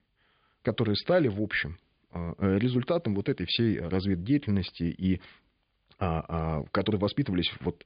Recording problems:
high frequencies cut off; severe; nothing above 5 kHz

